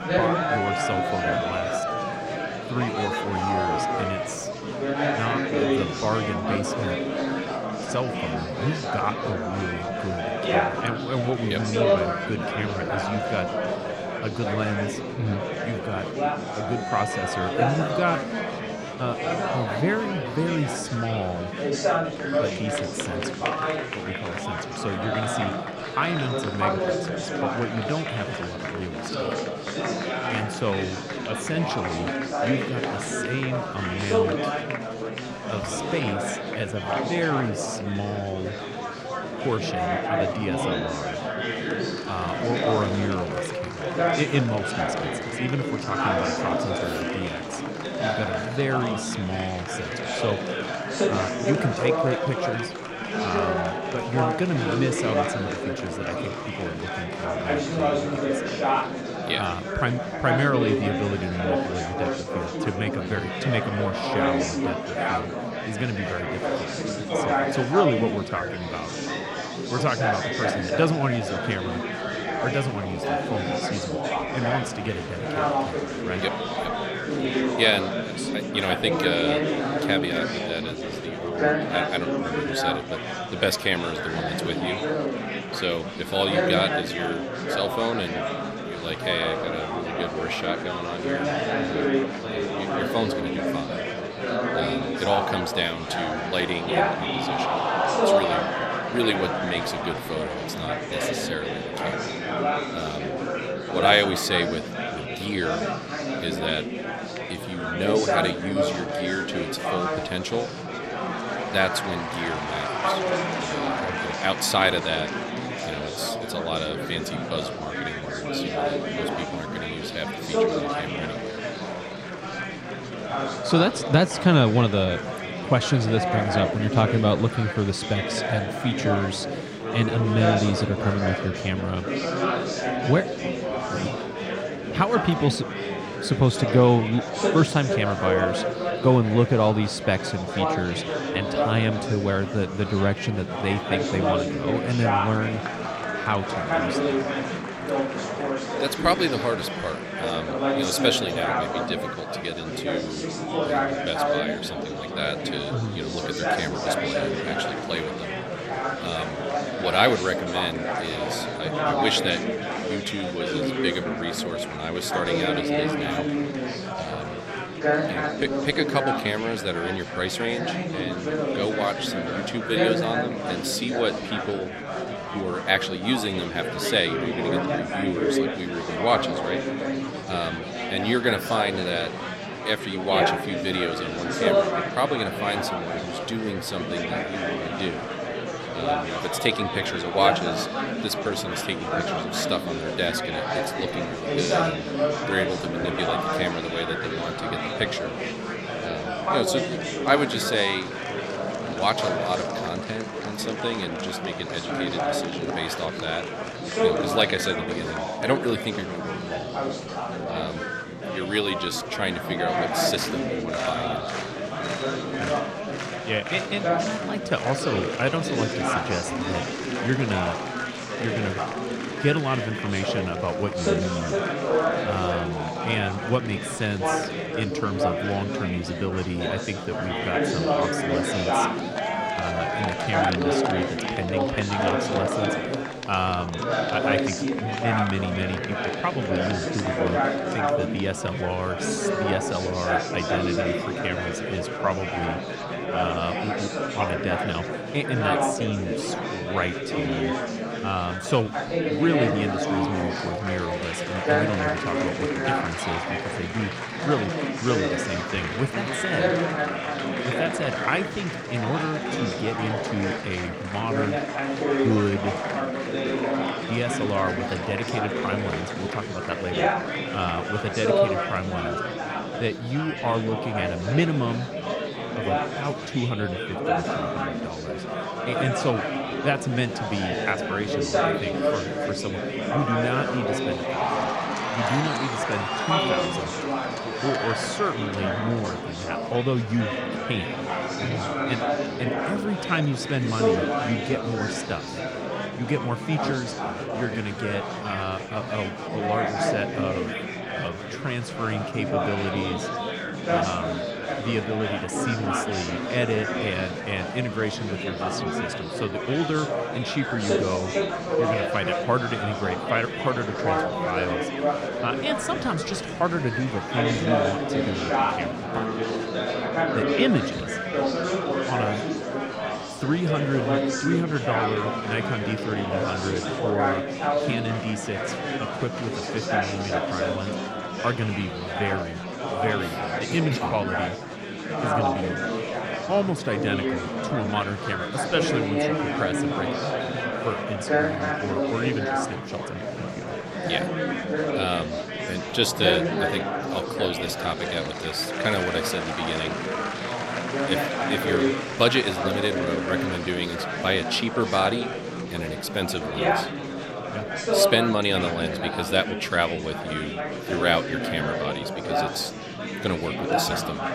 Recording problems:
murmuring crowd; very loud; throughout; 1 dB above the speech

